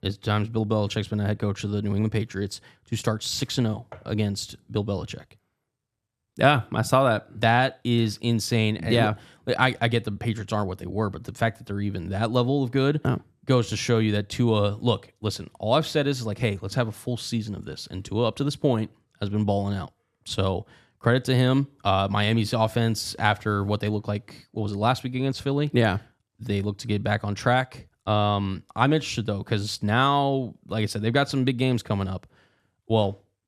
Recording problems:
none

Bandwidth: 14.5 kHz